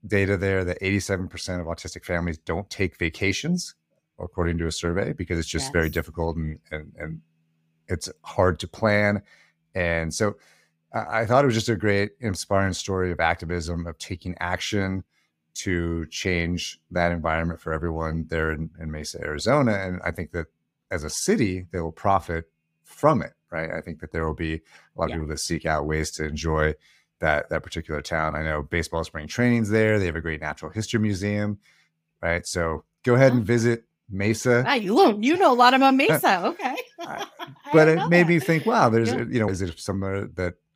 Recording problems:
none

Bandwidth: 15.5 kHz